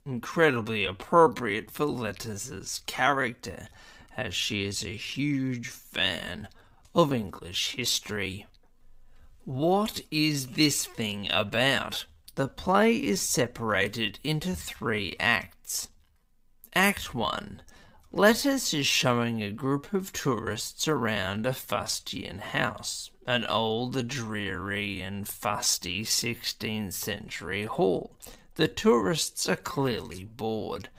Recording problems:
wrong speed, natural pitch; too slow; 0.6 times normal speed

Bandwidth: 15.5 kHz